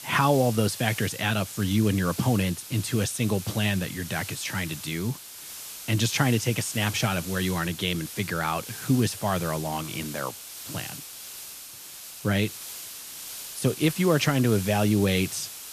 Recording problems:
hiss; noticeable; throughout; 10 dB below the speech

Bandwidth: 14.5 kHz